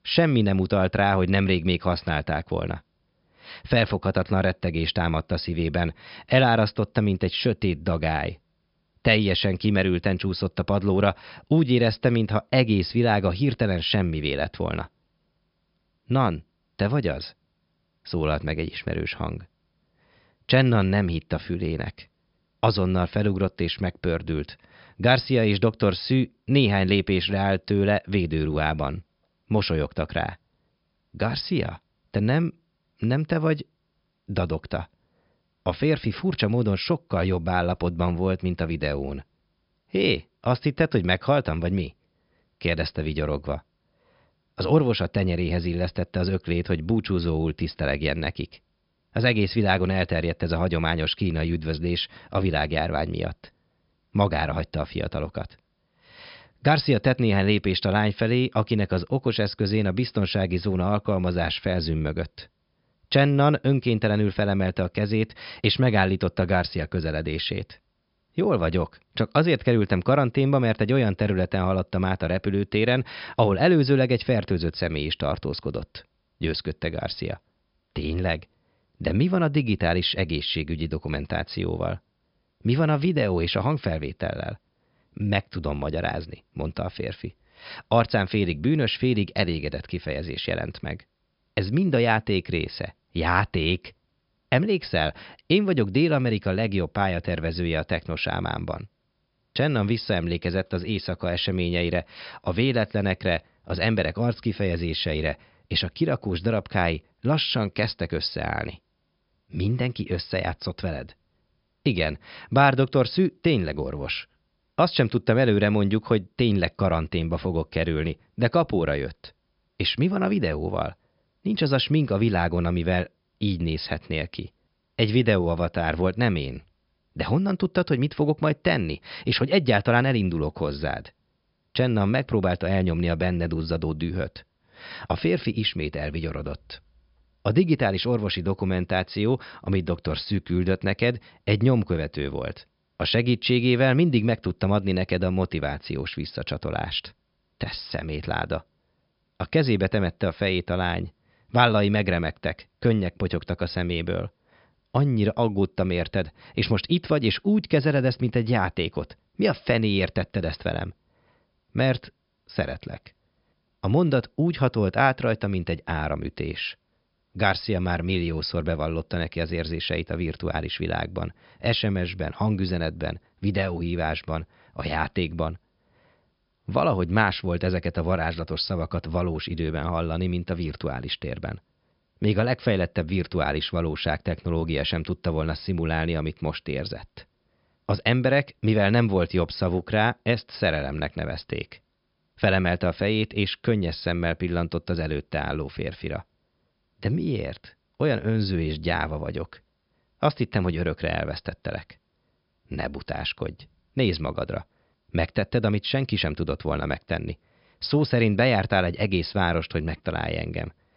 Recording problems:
high frequencies cut off; noticeable; nothing above 5.5 kHz

